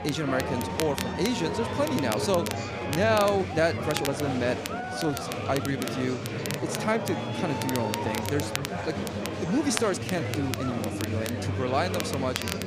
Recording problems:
murmuring crowd; loud; throughout; 3 dB below the speech
crackle, like an old record; loud; 9 dB below the speech
uneven, jittery; strongly; from 0.5 to 11 s

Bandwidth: 14.5 kHz